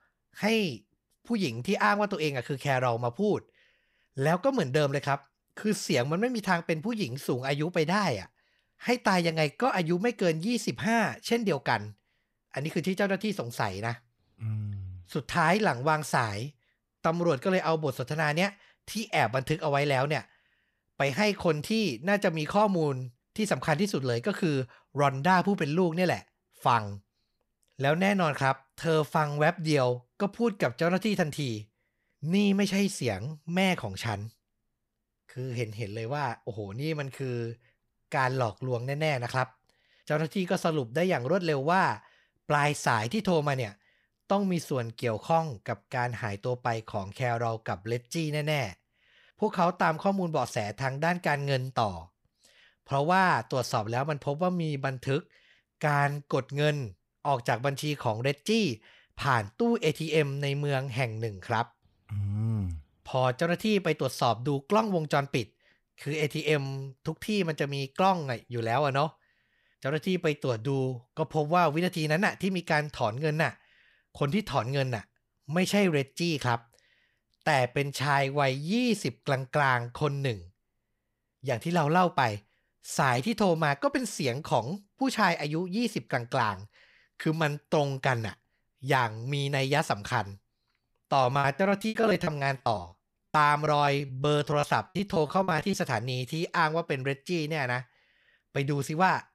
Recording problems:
choppy; very; from 1:31 to 1:36; 18% of the speech affected

